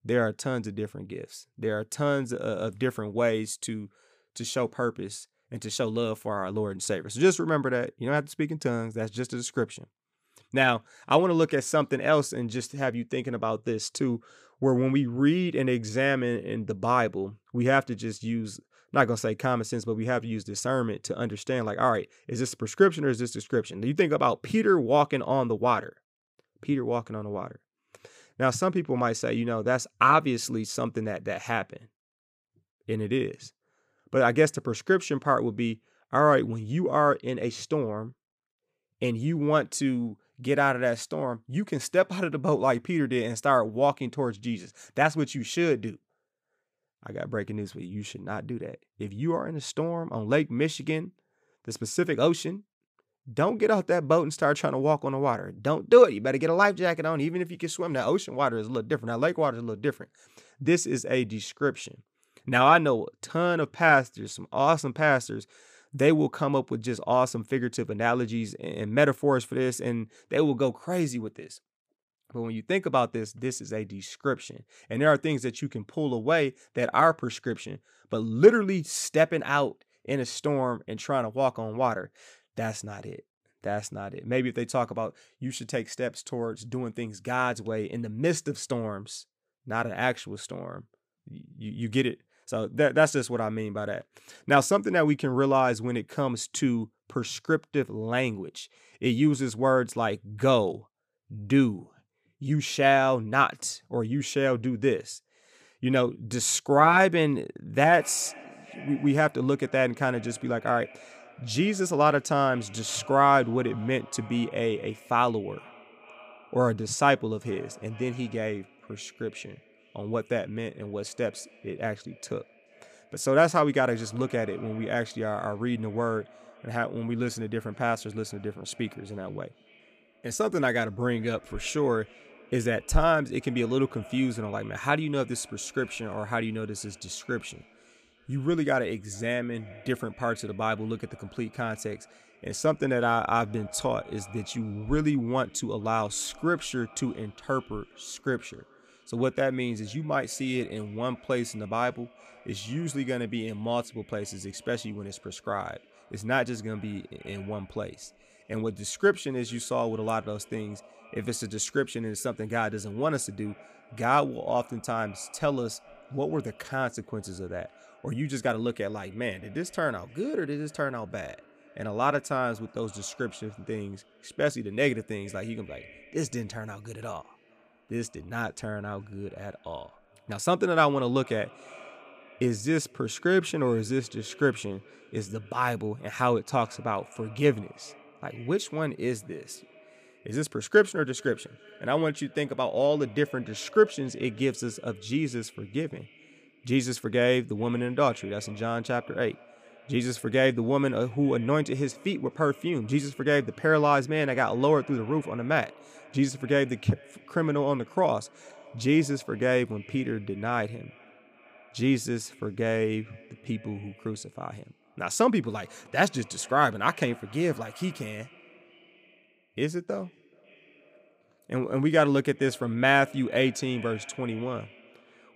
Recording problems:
echo of what is said; faint; from 1:48 on; 430 ms later, 25 dB below the speech

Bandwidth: 15 kHz